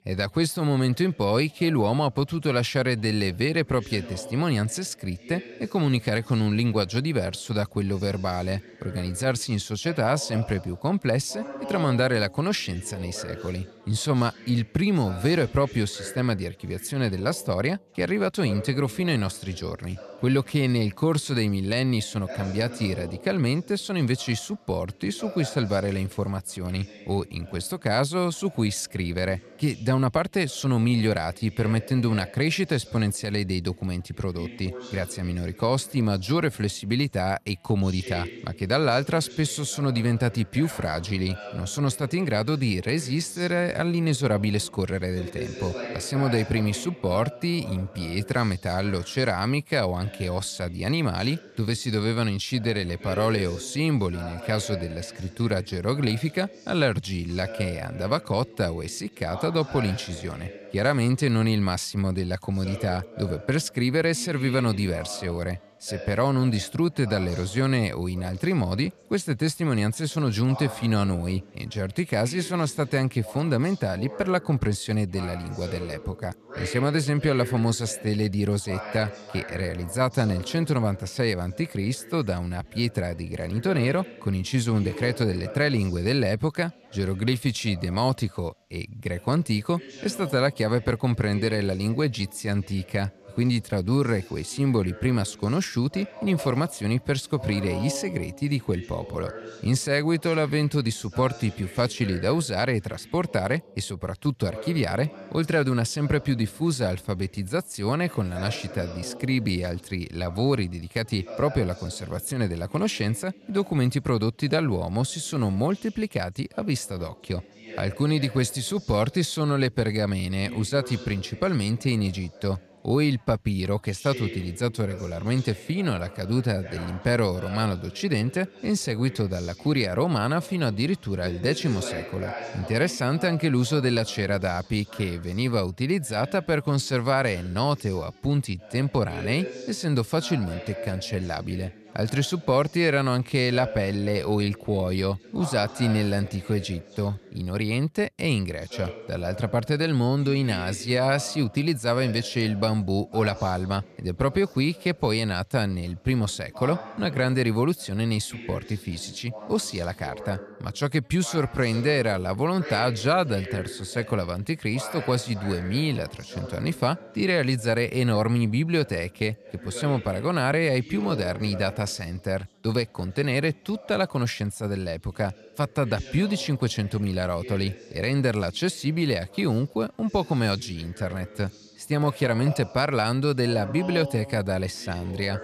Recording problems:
background chatter; noticeable; throughout; 2 voices, 15 dB below the speech

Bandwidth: 14 kHz